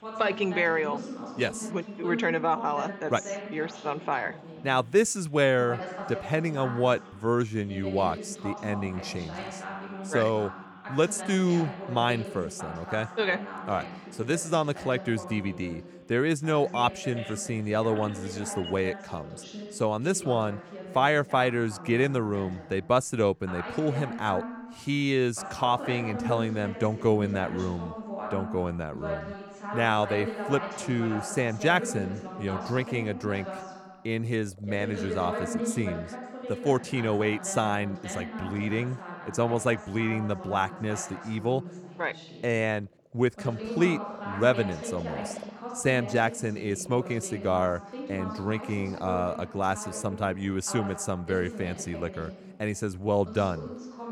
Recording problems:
voice in the background; loud; throughout; 10 dB below the speech
animal sounds; faint; throughout; 25 dB below the speech

